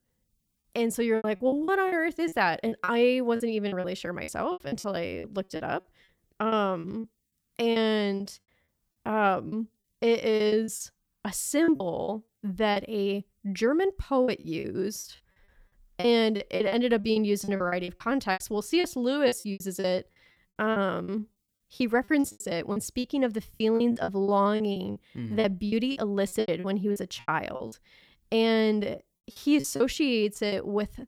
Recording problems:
choppy; very; 14% of the speech affected

